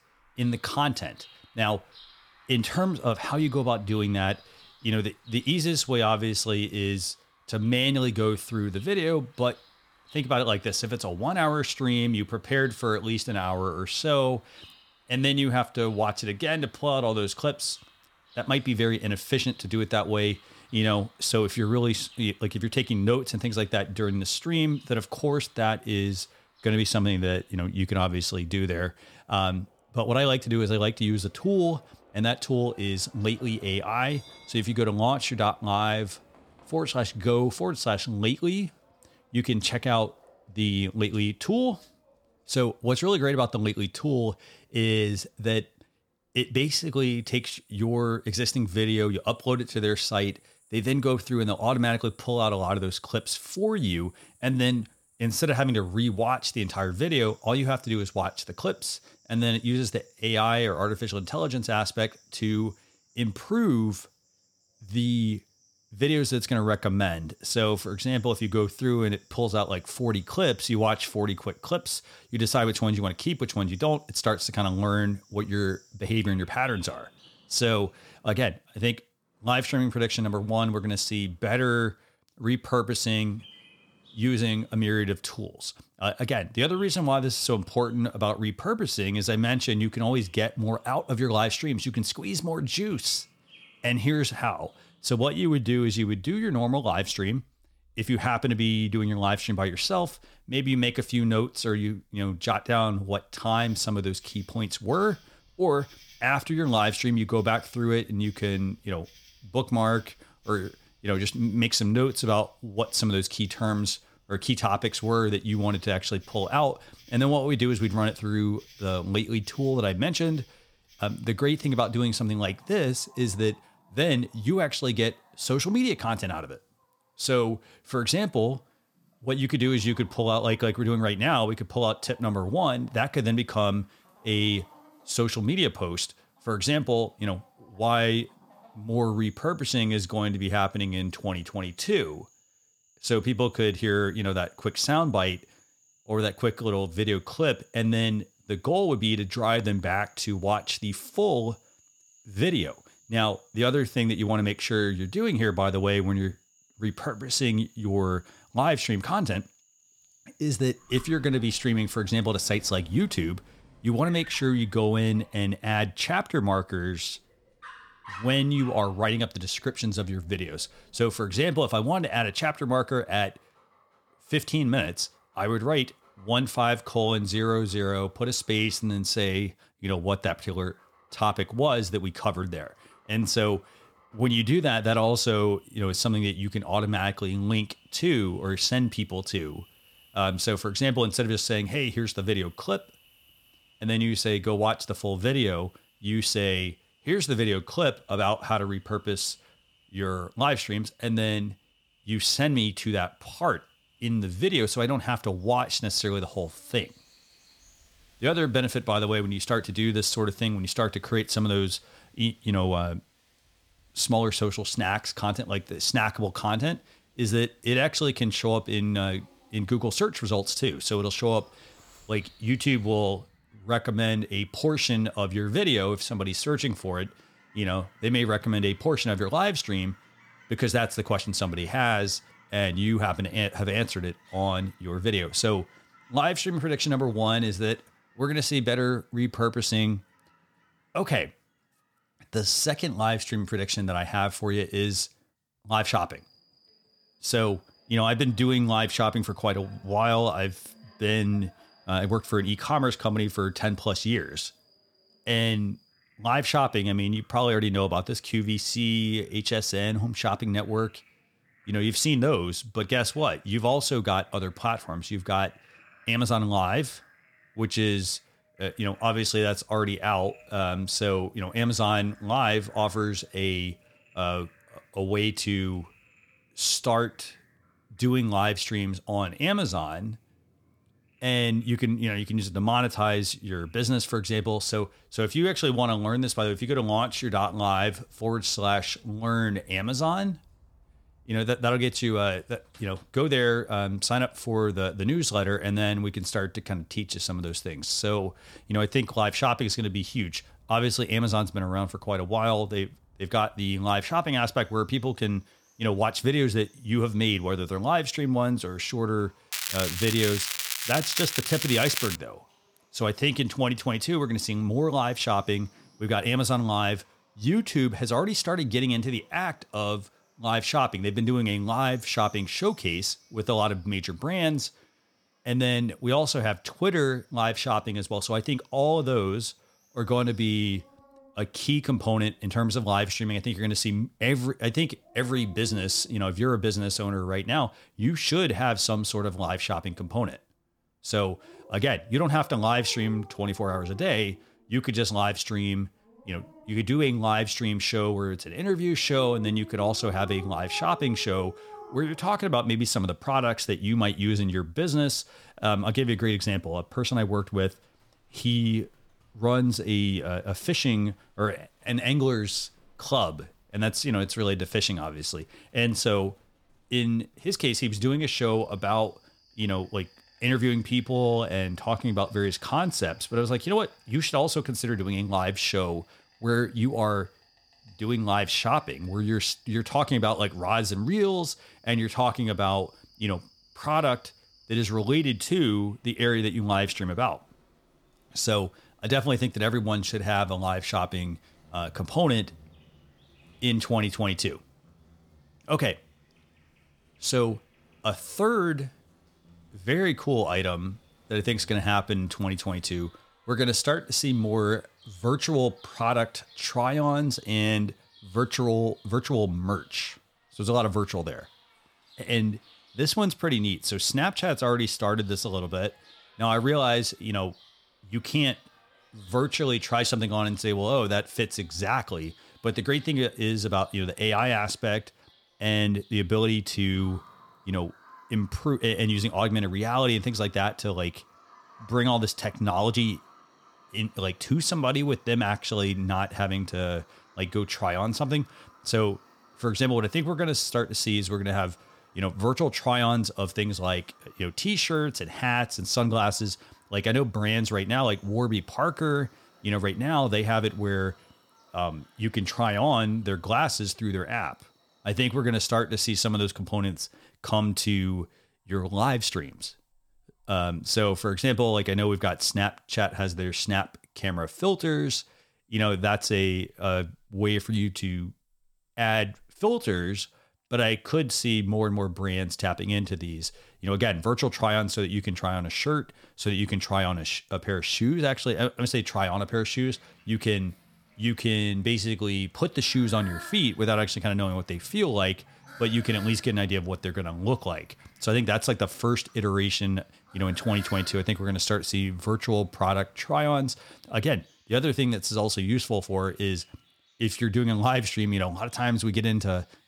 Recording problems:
crackling; loud; from 5:10 to 5:12; 3 dB below the speech
animal sounds; faint; throughout; 30 dB below the speech

